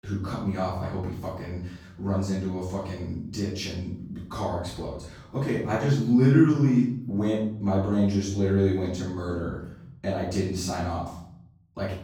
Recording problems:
off-mic speech; far
room echo; noticeable; dies away in 0.8 s

